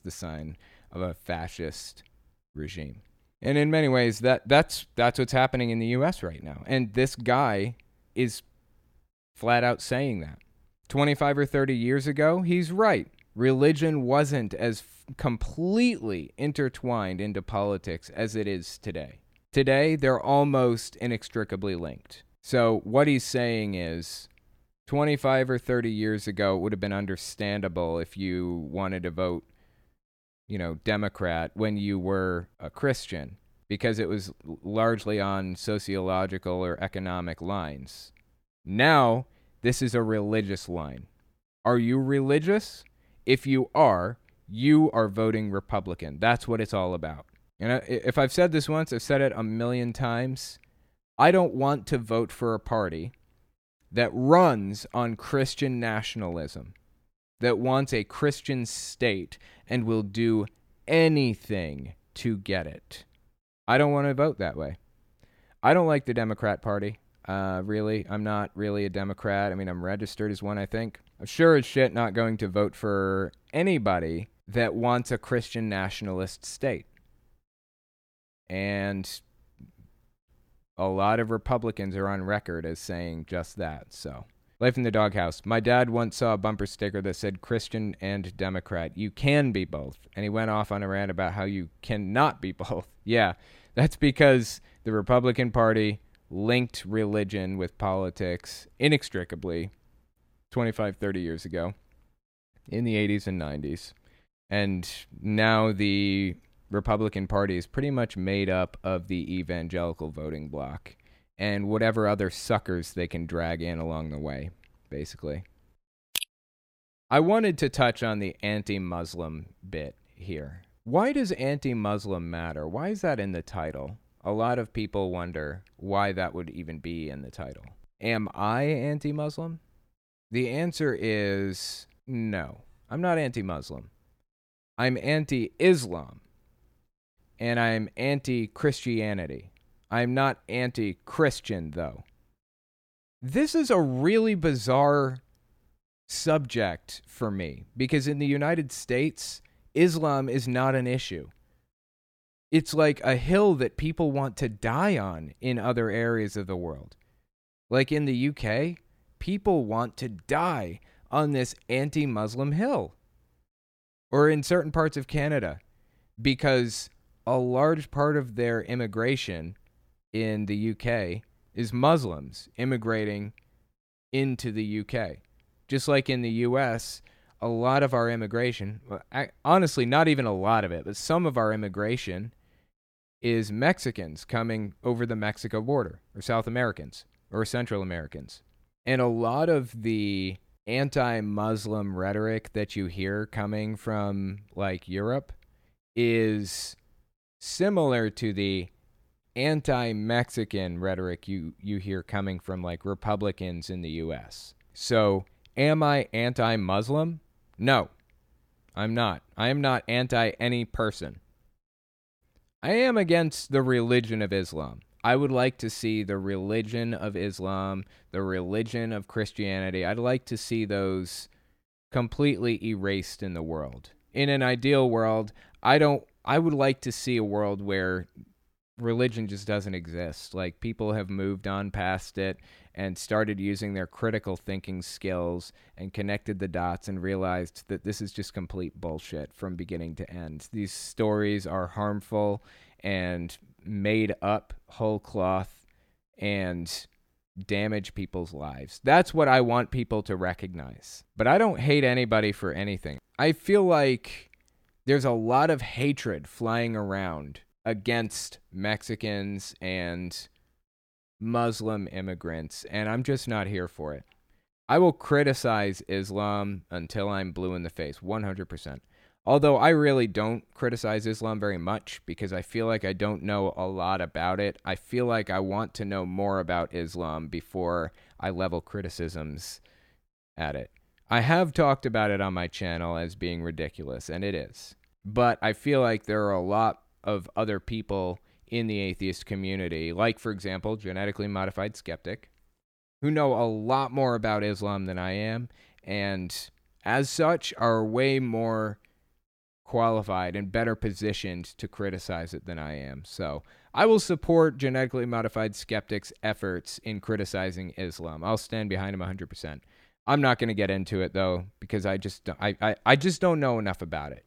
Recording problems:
none

